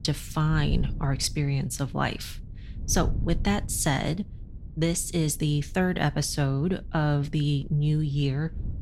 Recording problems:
wind noise on the microphone; occasional gusts; 20 dB below the speech

